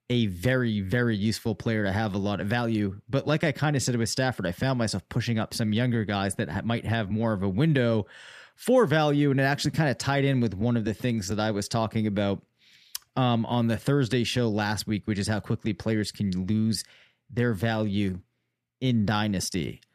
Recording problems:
none

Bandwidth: 14.5 kHz